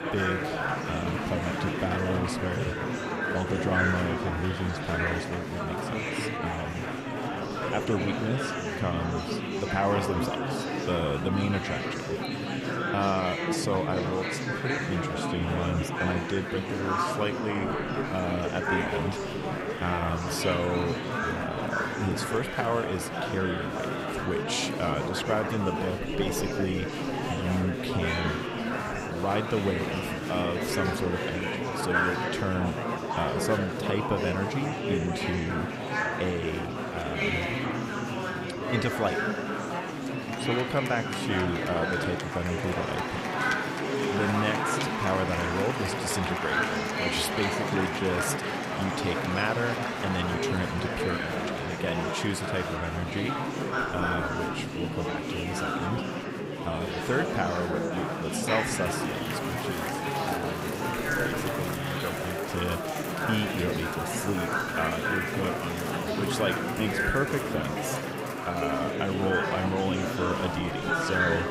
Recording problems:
murmuring crowd; very loud; throughout; 2 dB above the speech

